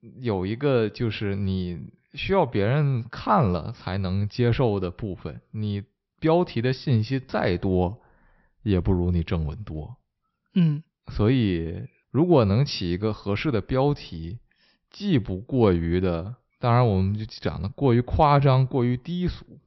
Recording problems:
high frequencies cut off; noticeable; nothing above 5.5 kHz

